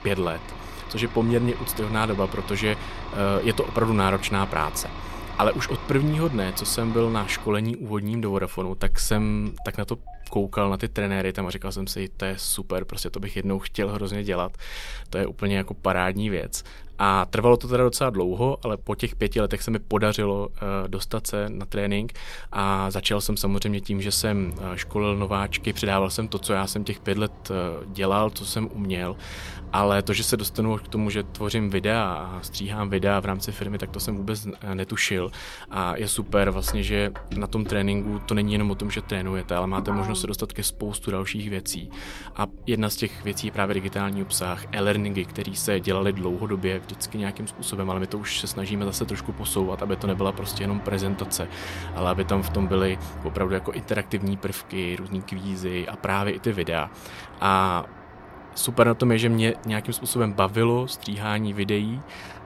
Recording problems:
traffic noise; noticeable; throughout; 15 dB below the speech

